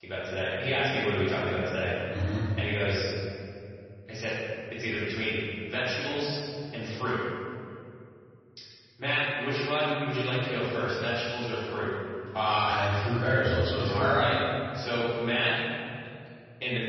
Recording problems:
room echo; strong; dies away in 2.5 s
off-mic speech; far
garbled, watery; slightly; nothing above 5.5 kHz

